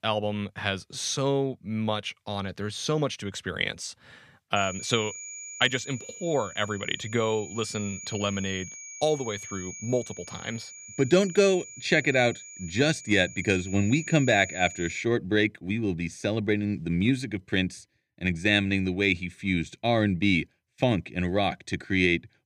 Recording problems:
high-pitched whine; noticeable; from 4.5 to 15 s; 7 kHz, 15 dB below the speech

